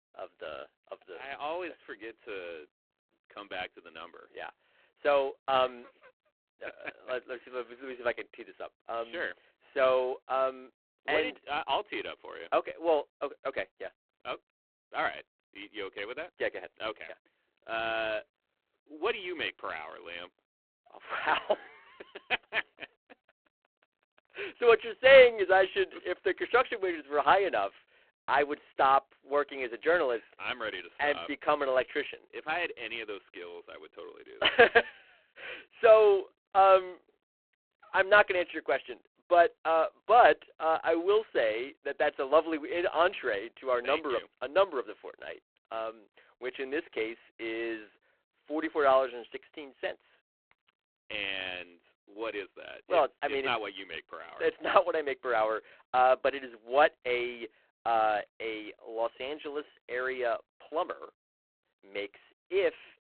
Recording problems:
phone-call audio; poor line

